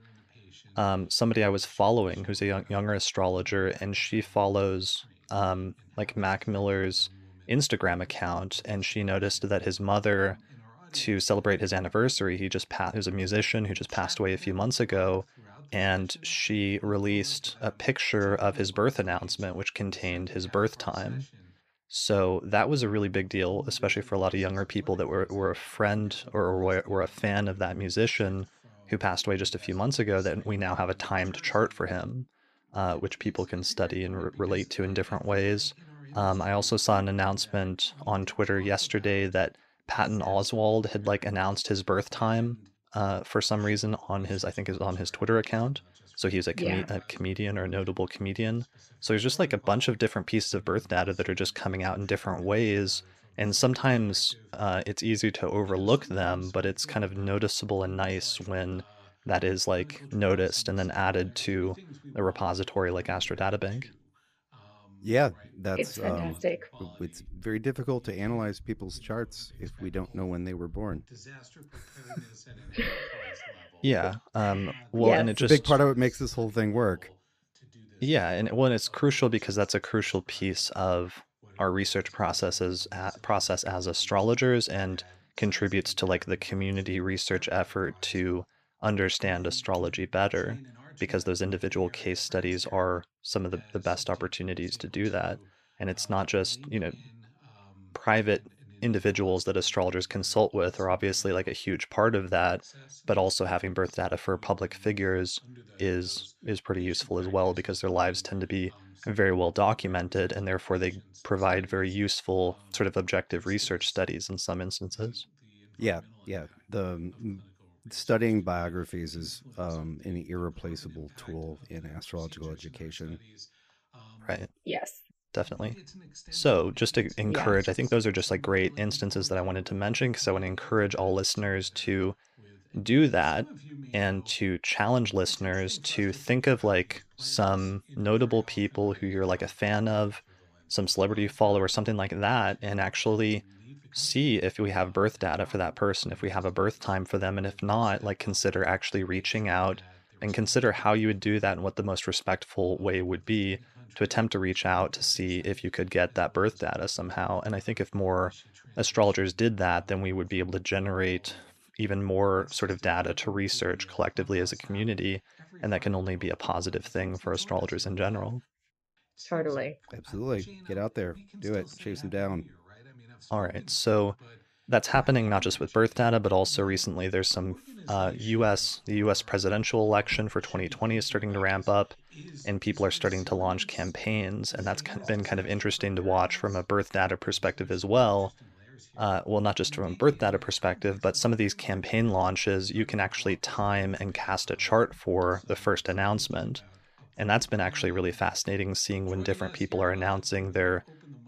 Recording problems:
voice in the background; faint; throughout; 25 dB below the speech

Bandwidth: 14.5 kHz